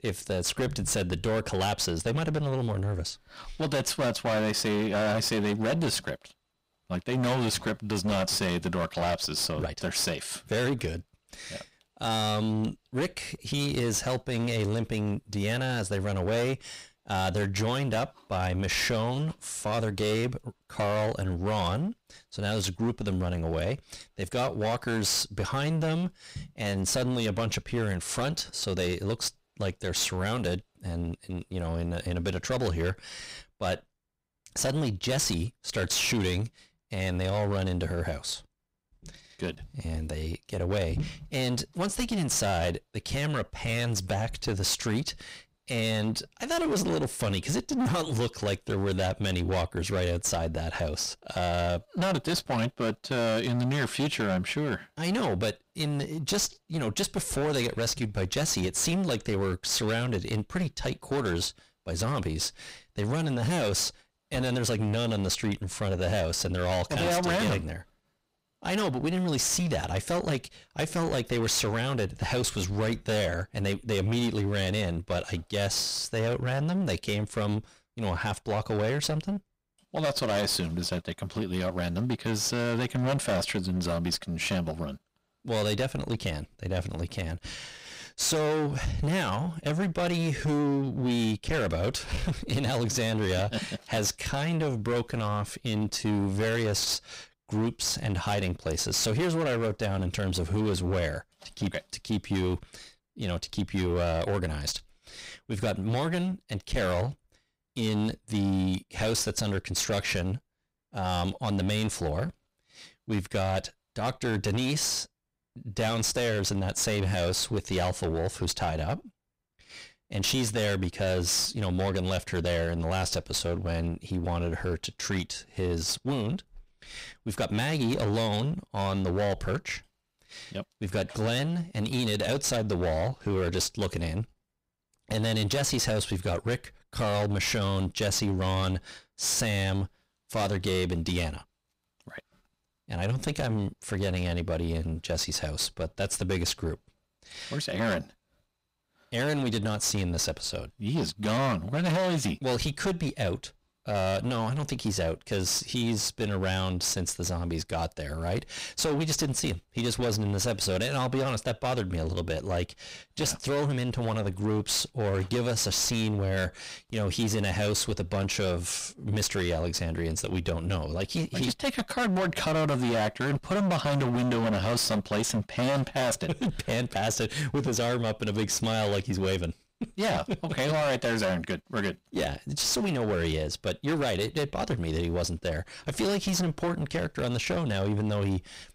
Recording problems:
distortion; heavy; 20% of the sound clipped

